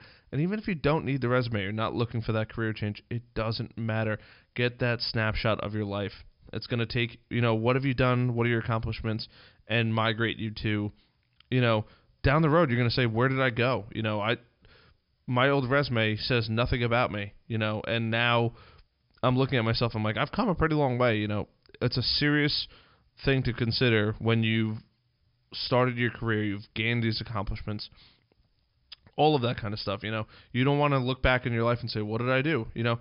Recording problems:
high frequencies cut off; noticeable; nothing above 5 kHz

